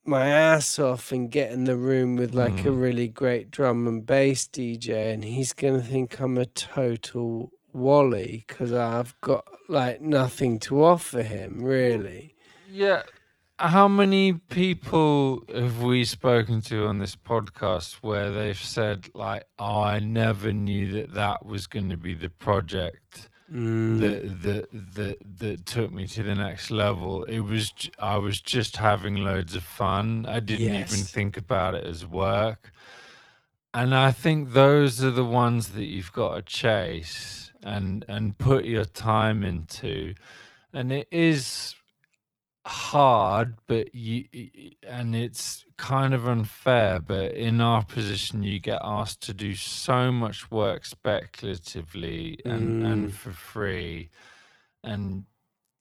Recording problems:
wrong speed, natural pitch; too slow; 0.6 times normal speed

